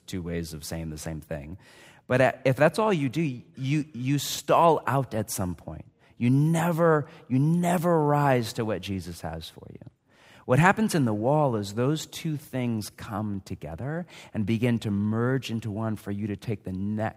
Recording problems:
none

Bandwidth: 15.5 kHz